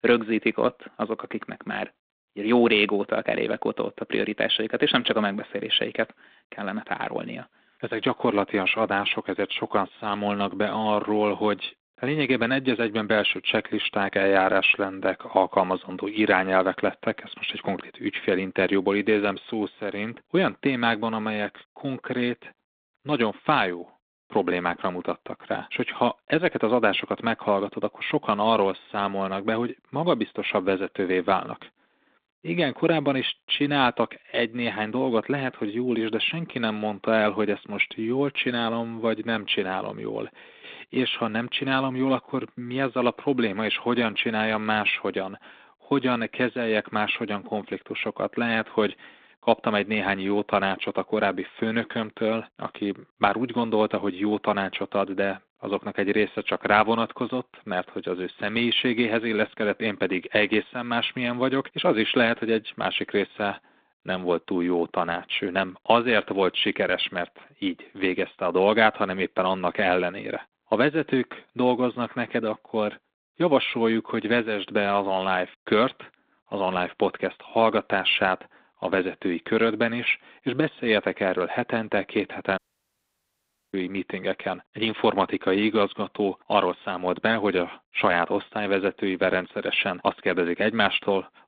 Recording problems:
phone-call audio; nothing above 3.5 kHz
audio cutting out; at 1:23 for 1 s

